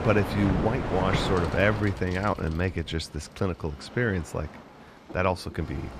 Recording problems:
train or aircraft noise; loud; throughout; 4 dB below the speech
traffic noise; faint; throughout; 20 dB below the speech
low rumble; faint; throughout; 25 dB below the speech

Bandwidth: 14.5 kHz